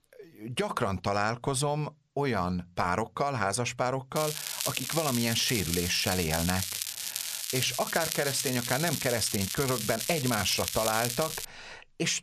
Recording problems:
crackling; loud; from 4 to 11 s; 2 dB below the speech

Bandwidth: 14 kHz